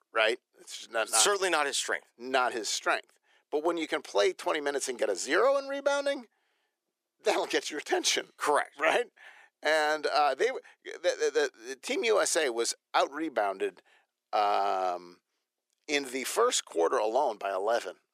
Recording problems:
thin; somewhat; fading below 350 Hz

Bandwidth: 15 kHz